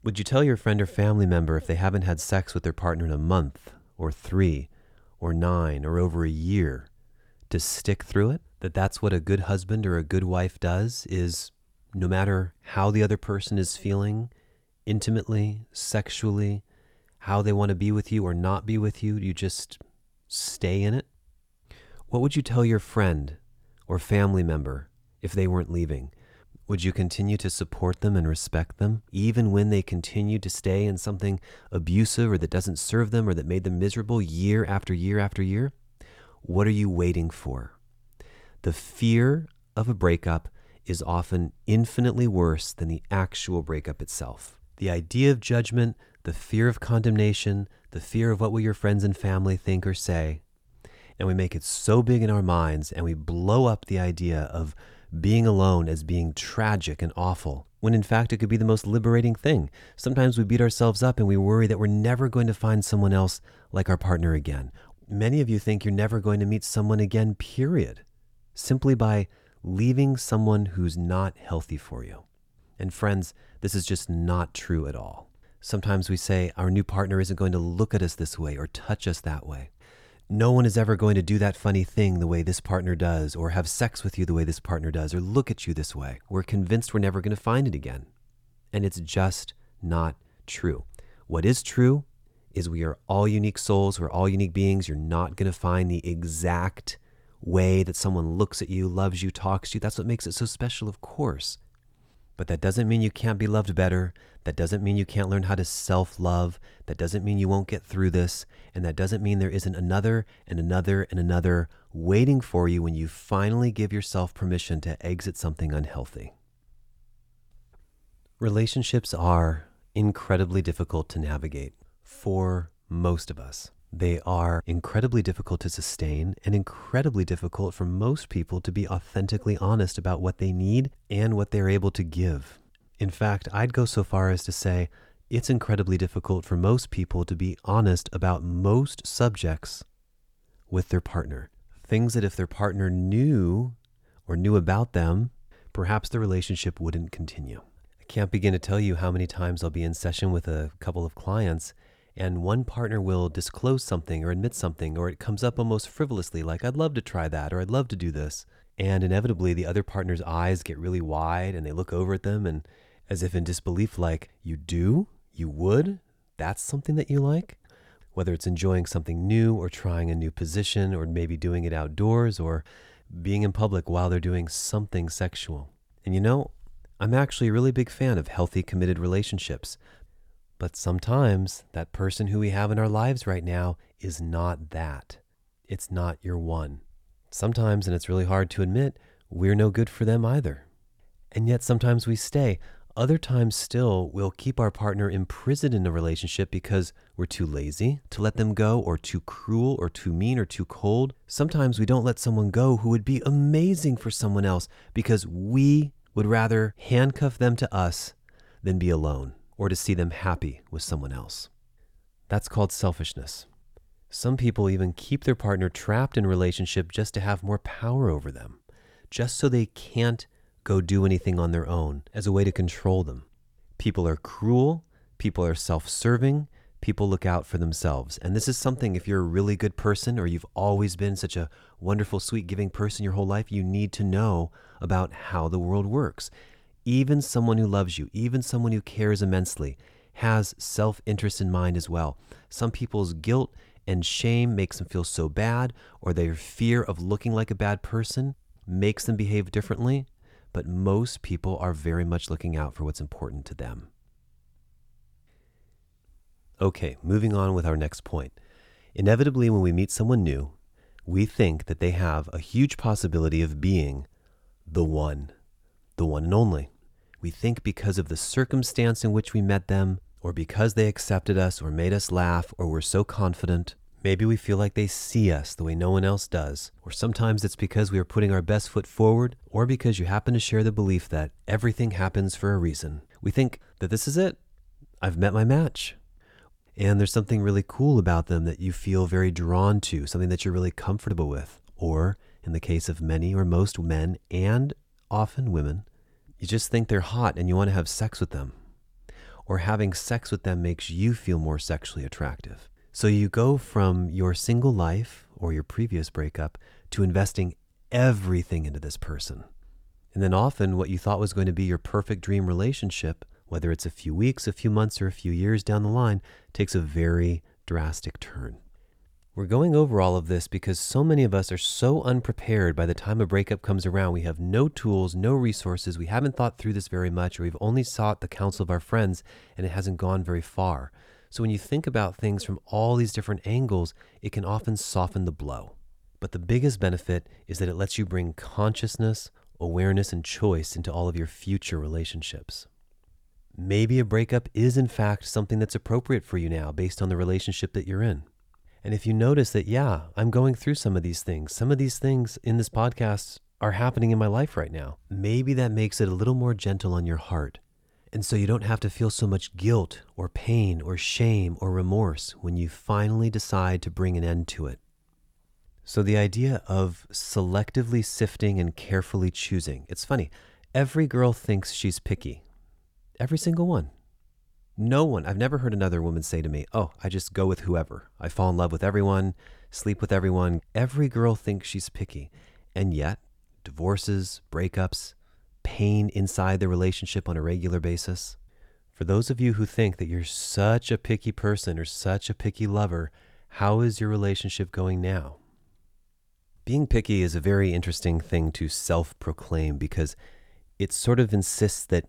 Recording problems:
none

